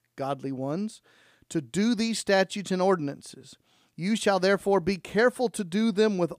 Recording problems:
none

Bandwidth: 15 kHz